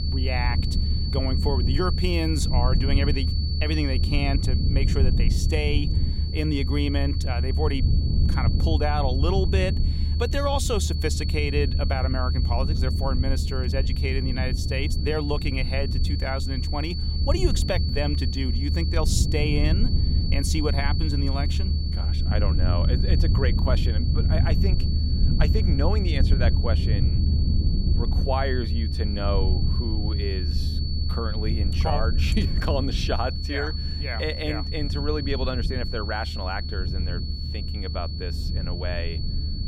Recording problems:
high-pitched whine; loud; throughout; 4.5 kHz, 6 dB below the speech
low rumble; loud; throughout; 9 dB below the speech

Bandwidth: 16 kHz